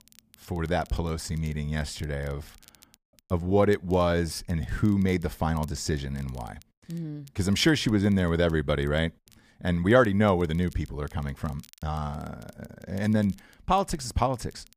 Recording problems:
crackle, like an old record; faint; 30 dB below the speech

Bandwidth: 15 kHz